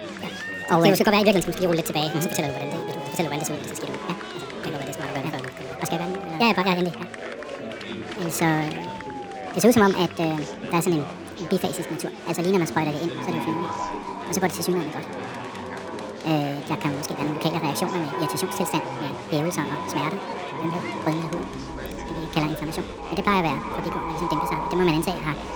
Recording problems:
echo of what is said; strong; from 13 s on; 310 ms later, 10 dB below the speech
wrong speed and pitch; too fast and too high; 1.6 times normal speed
chatter from many people; loud; throughout; 9 dB below the speech

